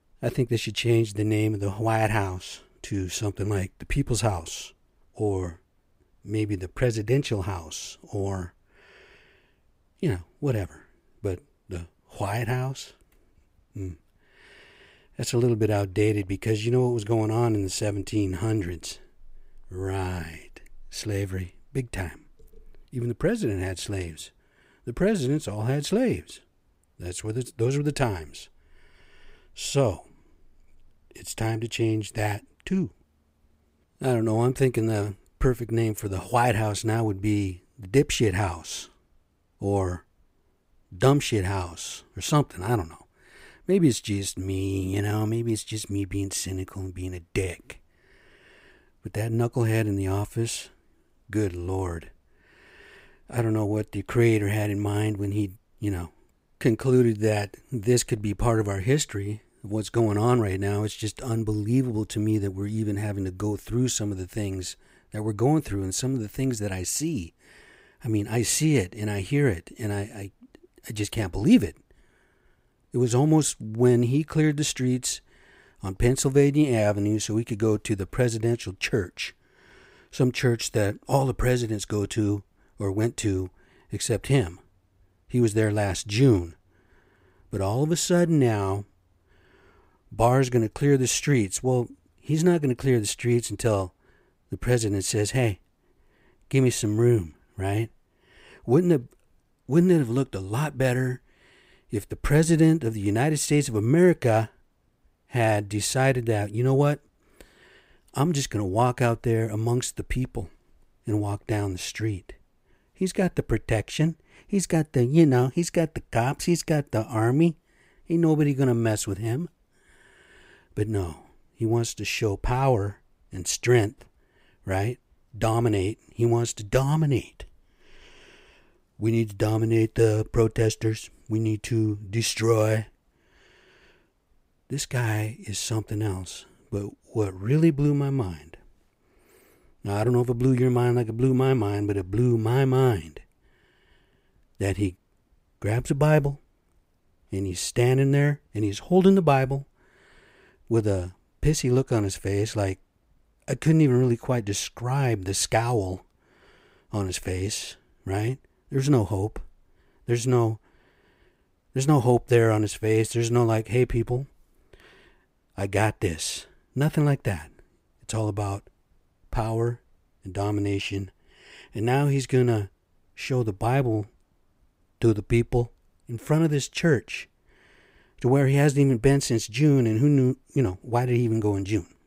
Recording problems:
none

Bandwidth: 15.5 kHz